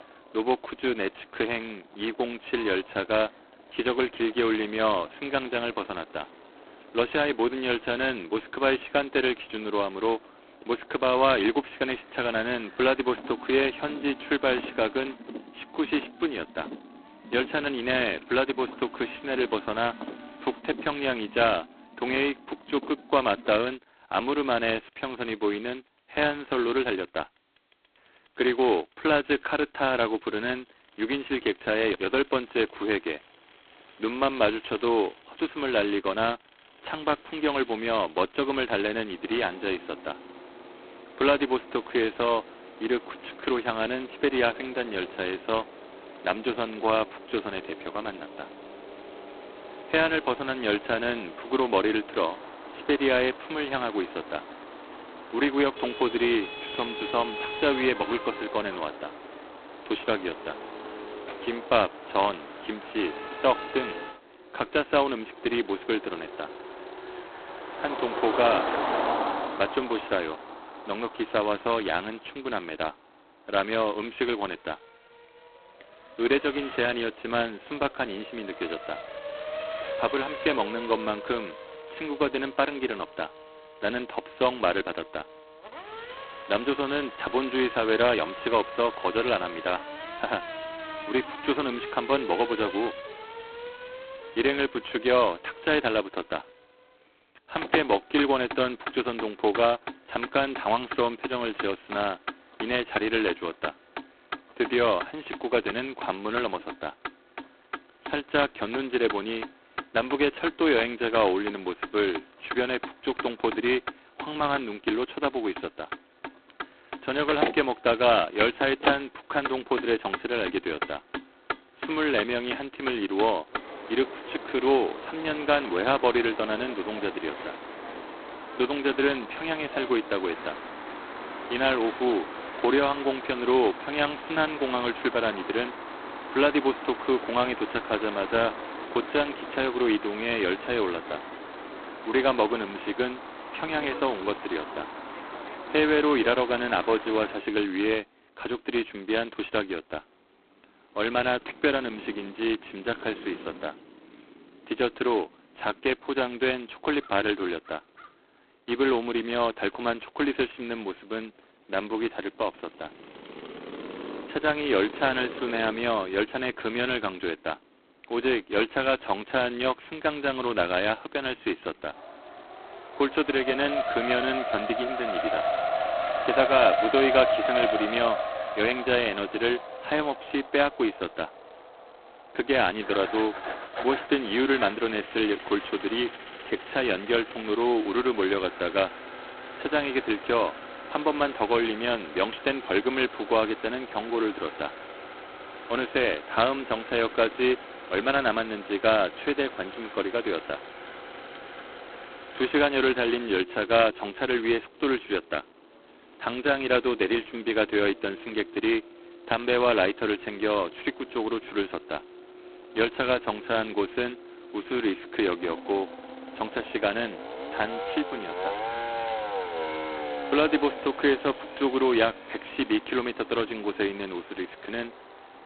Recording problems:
phone-call audio; poor line; nothing above 4 kHz
traffic noise; loud; throughout; 10 dB below the speech

